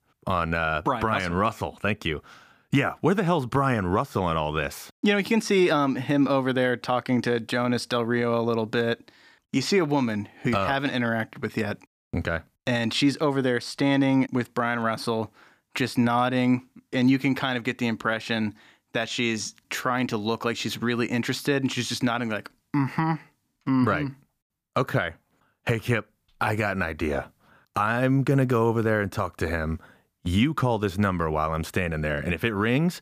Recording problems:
none

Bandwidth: 15 kHz